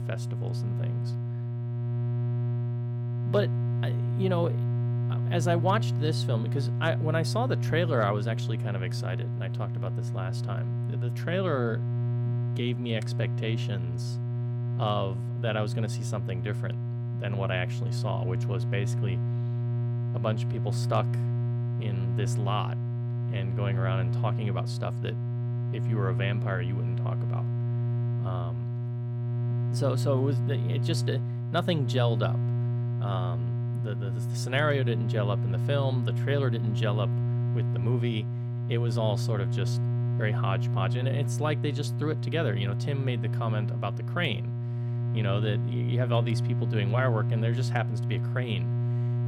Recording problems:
electrical hum; loud; throughout; 60 Hz, 7 dB below the speech

